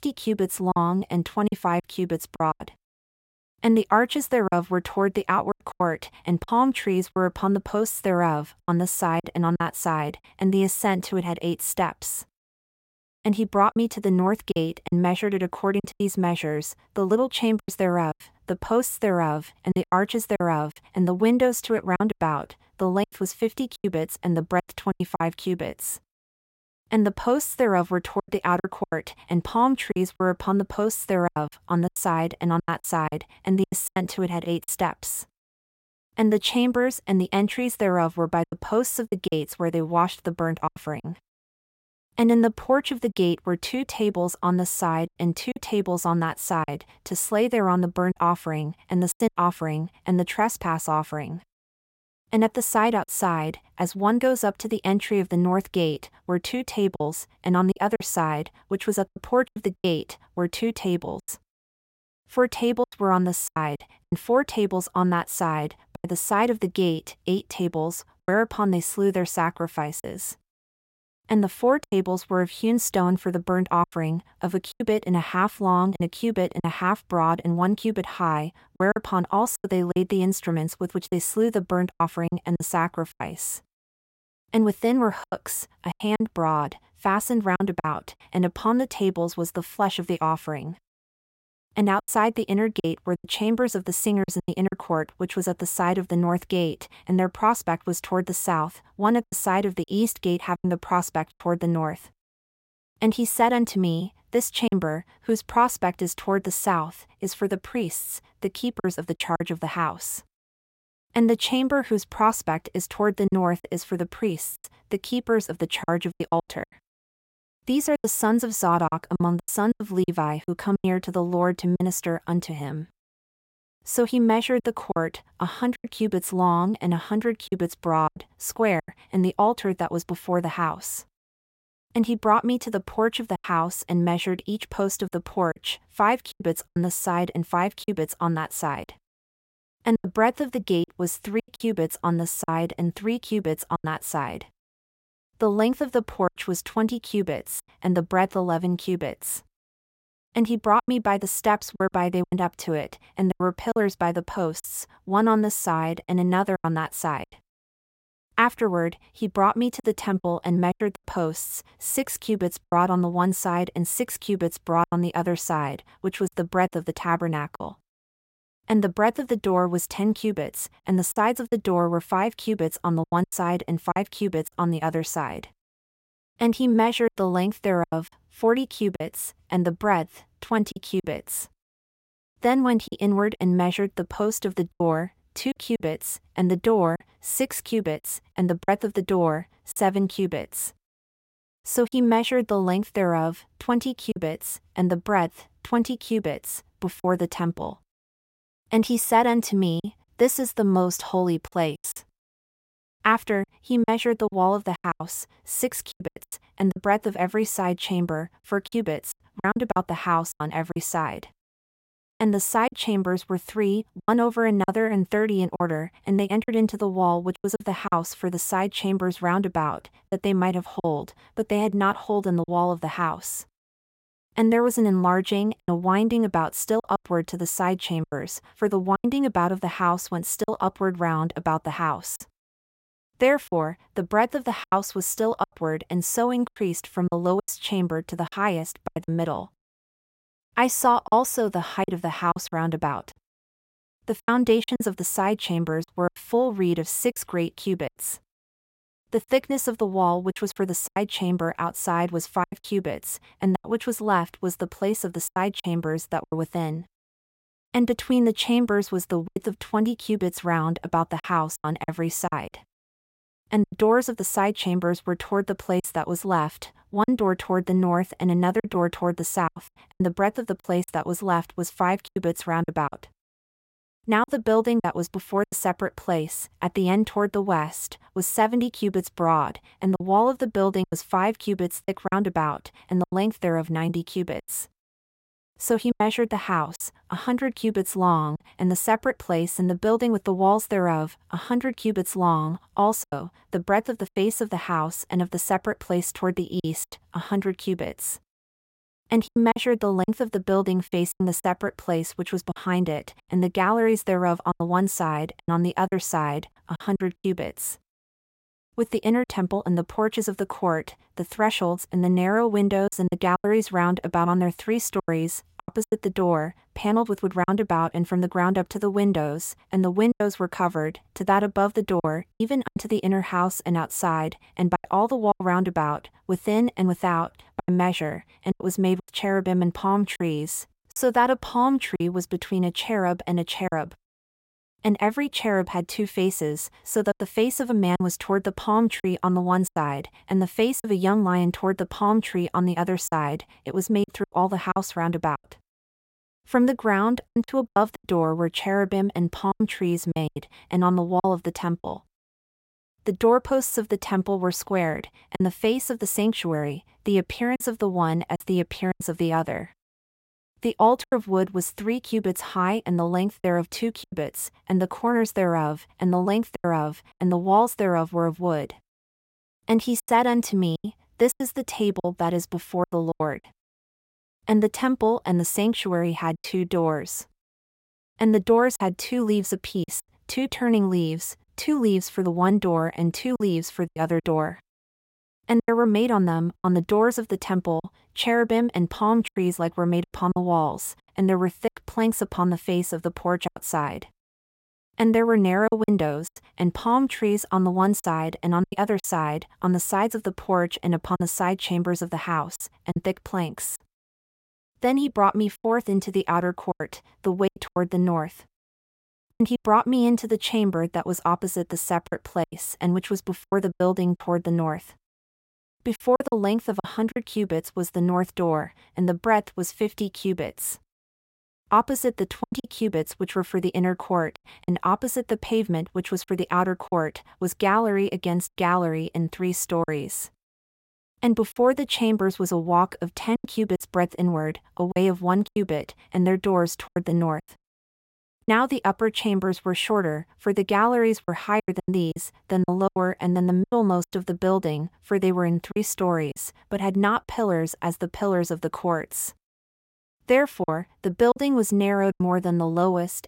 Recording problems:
choppy; very; 7% of the speech affected

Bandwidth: 16 kHz